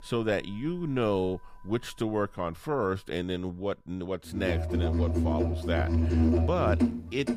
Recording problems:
background music; very loud; throughout; 4 dB above the speech

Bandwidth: 14.5 kHz